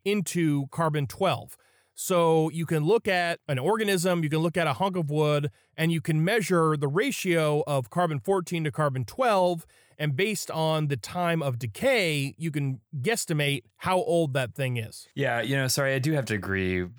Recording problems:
none

